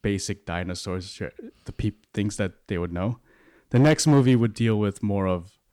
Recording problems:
distortion; slight; 3% of the sound clipped

